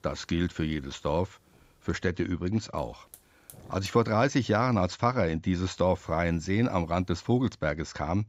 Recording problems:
high frequencies cut off; noticeable; nothing above 8 kHz
hiss; faint; until 2 s, from 3 to 5 s and from 6 to 7.5 s; 30 dB below the speech

